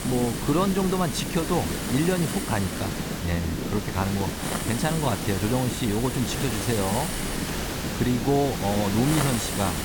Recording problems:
hiss; loud; throughout; 4 dB below the speech
low rumble; noticeable; throughout; 10 dB below the speech

